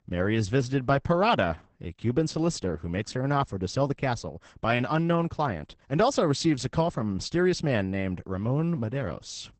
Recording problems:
garbled, watery; badly; nothing above 8 kHz

